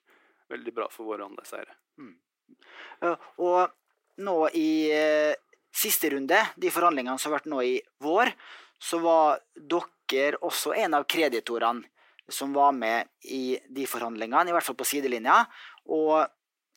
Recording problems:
thin; somewhat; fading below 350 Hz

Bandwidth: 16 kHz